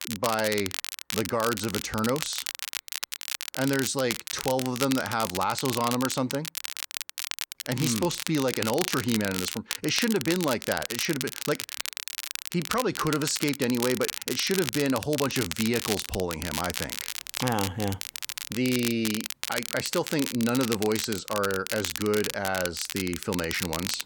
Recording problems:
crackle, like an old record; loud; 4 dB below the speech

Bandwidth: 18 kHz